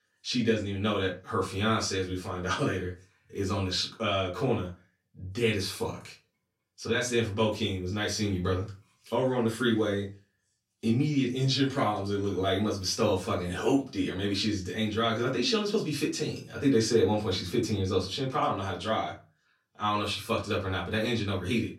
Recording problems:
off-mic speech; far
room echo; very slight; dies away in 0.2 s

